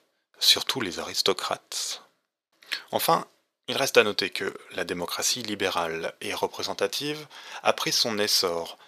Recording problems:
thin; very; fading below 500 Hz

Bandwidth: 14.5 kHz